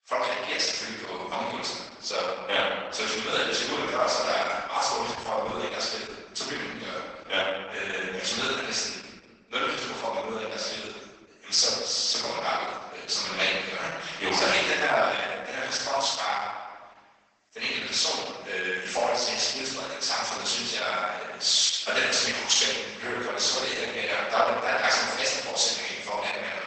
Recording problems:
room echo; strong; dies away in 1.3 s
off-mic speech; far
garbled, watery; badly; nothing above 8 kHz
thin; very; fading below 700 Hz

